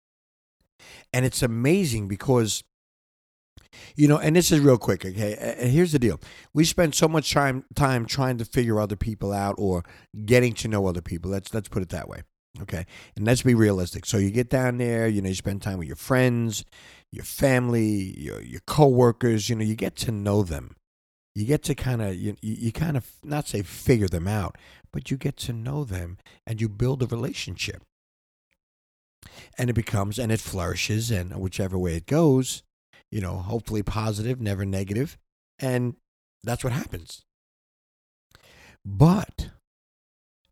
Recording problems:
none

